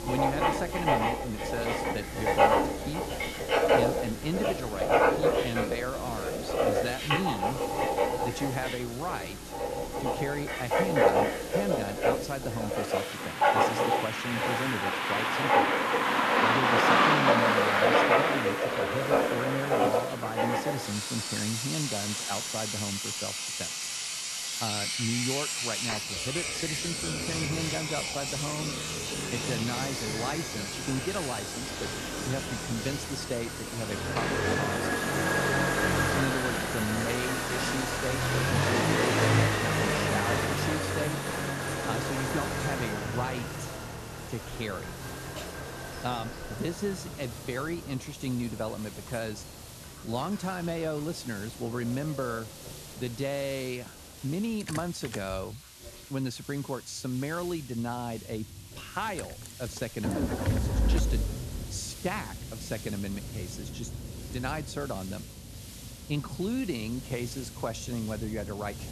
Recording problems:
household noises; very loud; throughout; 5 dB above the speech
traffic noise; very loud; throughout; 5 dB above the speech
hiss; noticeable; throughout; 10 dB below the speech

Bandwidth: 13.5 kHz